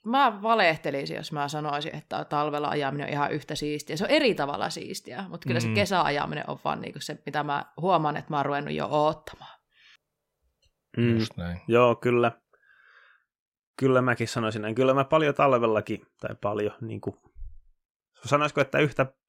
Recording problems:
none

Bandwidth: 16 kHz